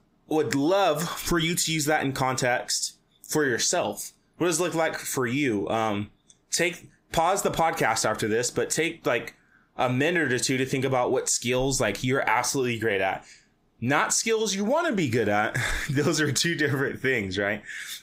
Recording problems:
squashed, flat; heavily

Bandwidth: 15.5 kHz